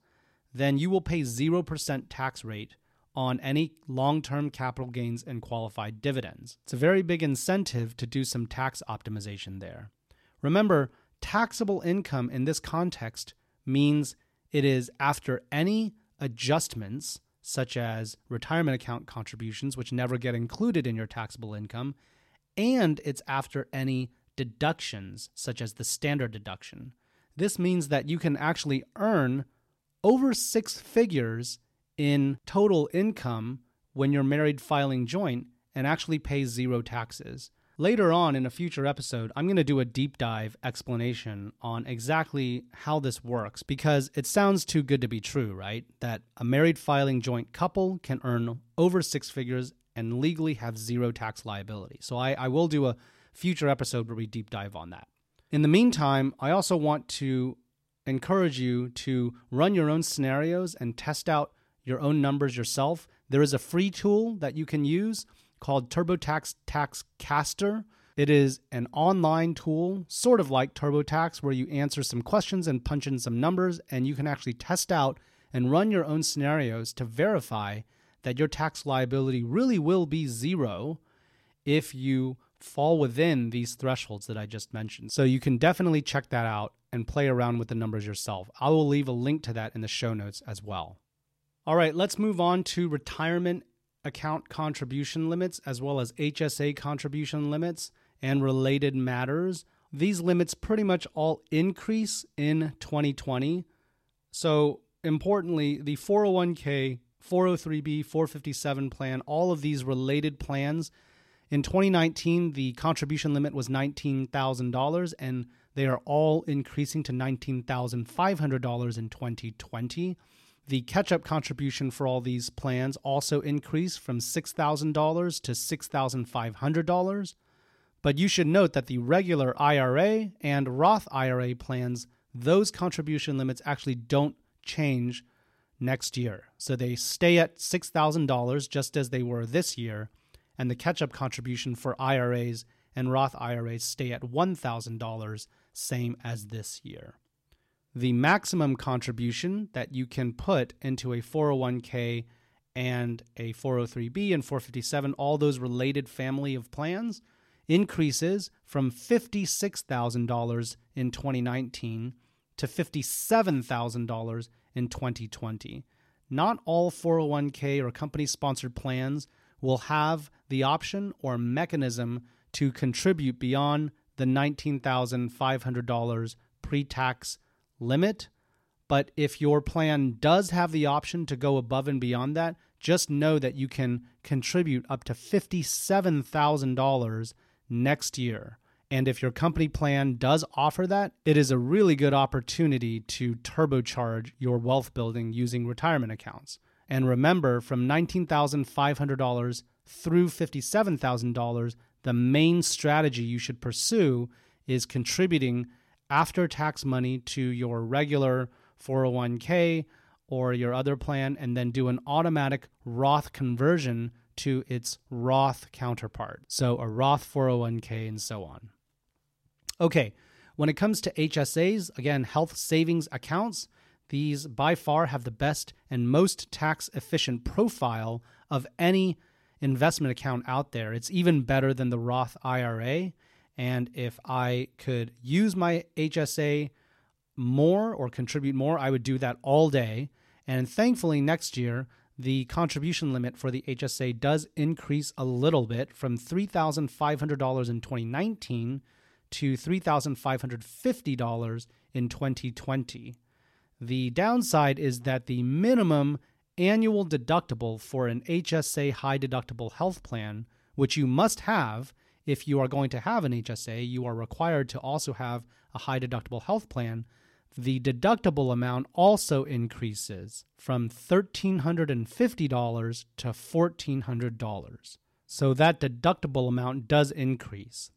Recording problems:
none

